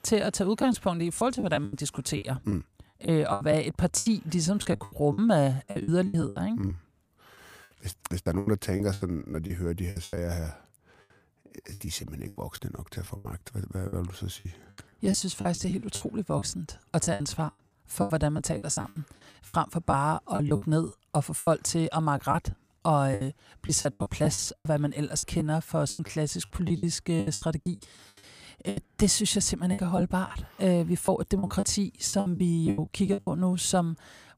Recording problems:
choppy; very; 14% of the speech affected

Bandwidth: 15 kHz